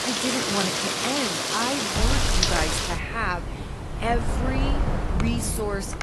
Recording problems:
garbled, watery; slightly; nothing above 11.5 kHz
rain or running water; very loud; throughout; 3 dB above the speech
wind noise on the microphone; heavy; from 2 s on; 6 dB below the speech
hiss; faint; throughout; 25 dB below the speech
murmuring crowd; very faint; throughout; 25 dB below the speech

